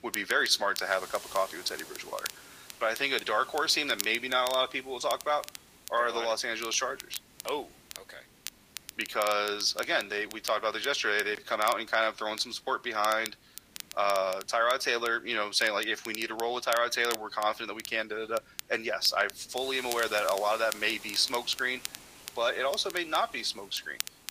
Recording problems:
thin; very; fading below 700 Hz
garbled, watery; slightly; nothing above 15 kHz
crackle, like an old record; noticeable; 15 dB below the speech
hiss; faint; throughout; 20 dB below the speech

